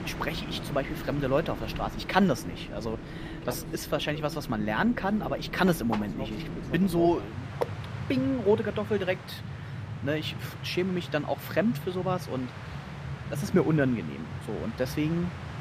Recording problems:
train or aircraft noise; loud; throughout; 8 dB below the speech

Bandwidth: 15 kHz